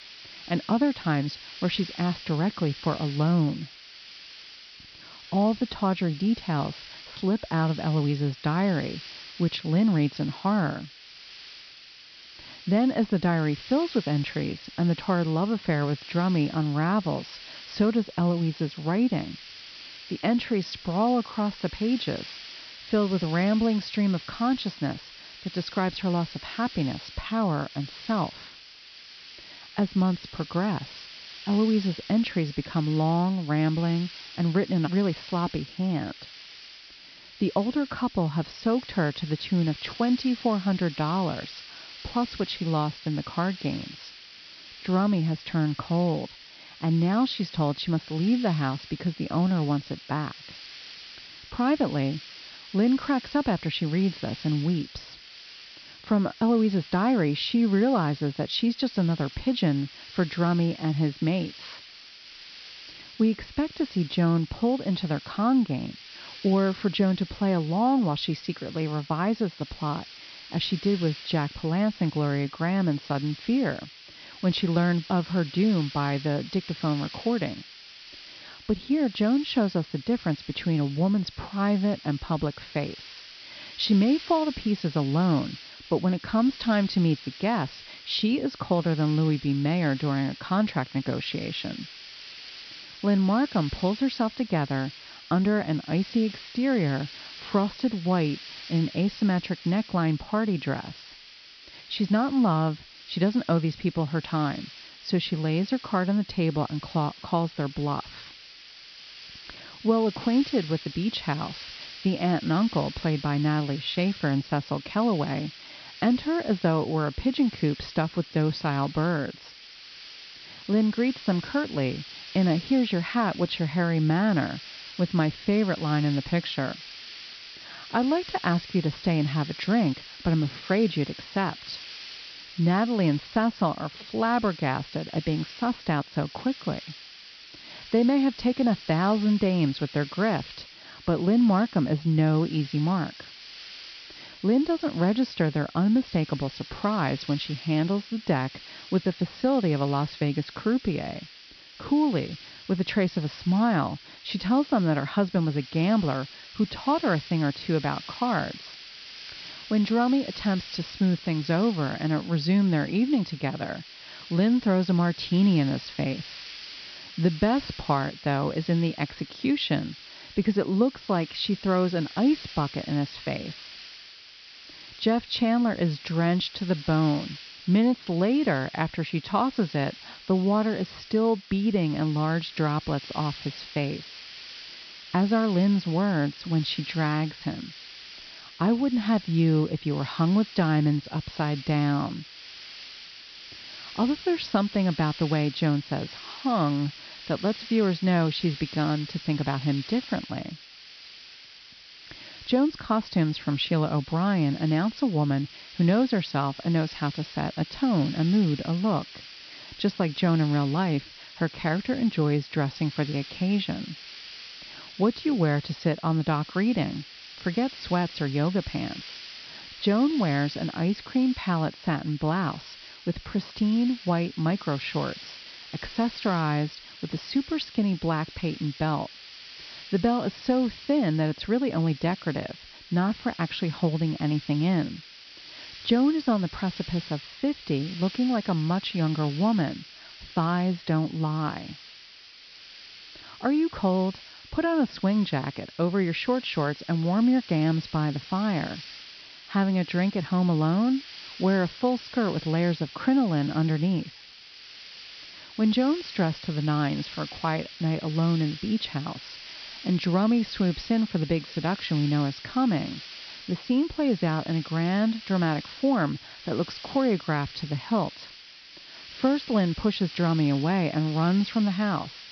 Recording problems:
high frequencies cut off; noticeable; nothing above 5.5 kHz
hiss; noticeable; throughout; 15 dB below the speech

